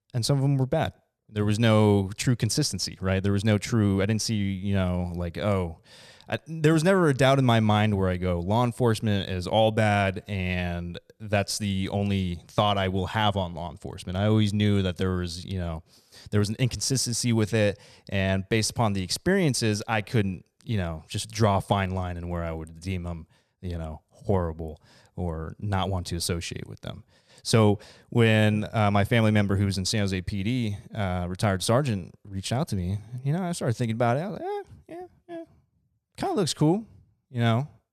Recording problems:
none

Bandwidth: 14 kHz